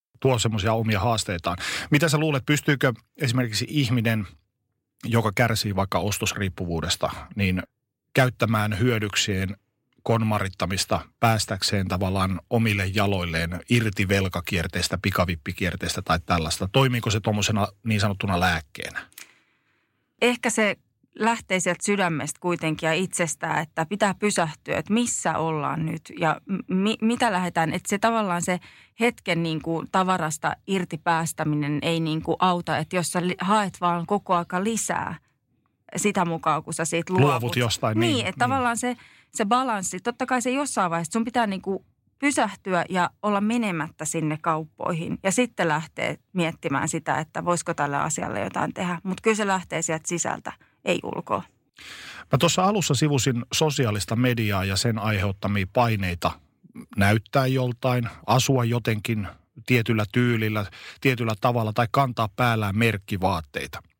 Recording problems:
none

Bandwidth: 16 kHz